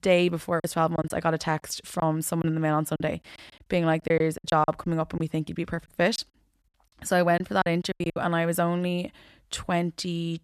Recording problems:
choppy; very; from 0.5 to 2.5 s, from 3 to 5 s and from 6 to 8 s; 12% of the speech affected

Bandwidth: 14 kHz